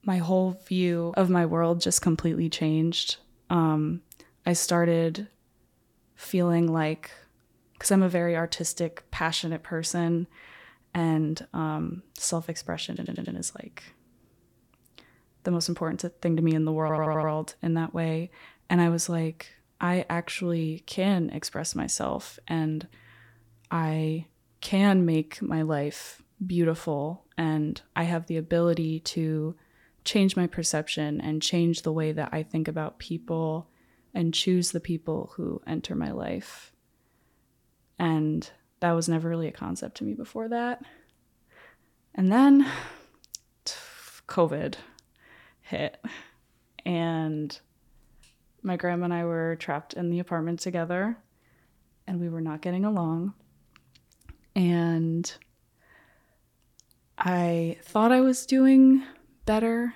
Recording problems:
audio stuttering; at 13 s and at 17 s

